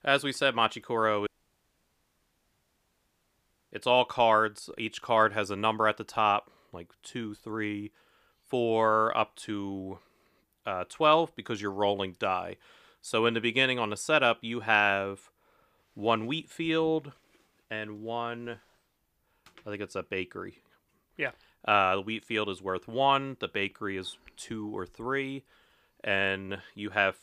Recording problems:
audio cutting out; at 1.5 s for 2.5 s

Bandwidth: 15 kHz